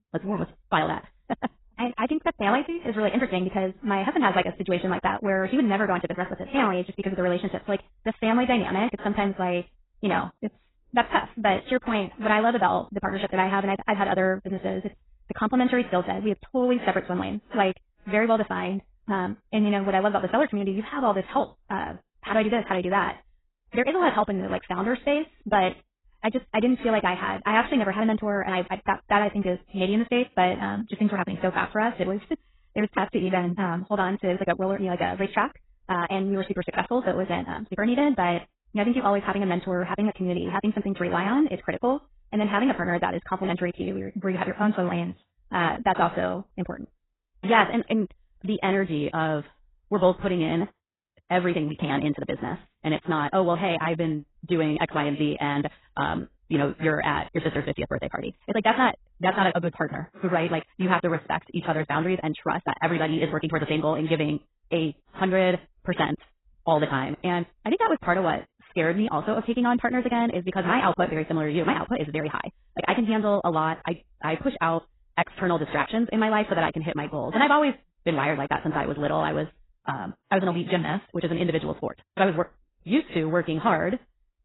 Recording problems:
garbled, watery; badly; nothing above 4 kHz
wrong speed, natural pitch; too fast; 1.6 times normal speed

